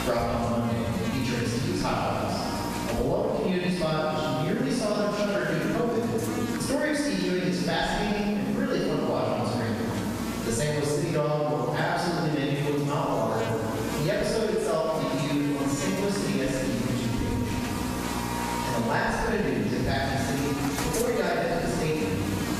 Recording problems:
room echo; strong; dies away in 1.9 s
off-mic speech; far
squashed, flat; somewhat
electrical hum; loud; throughout; 60 Hz, 8 dB below the speech

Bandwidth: 14.5 kHz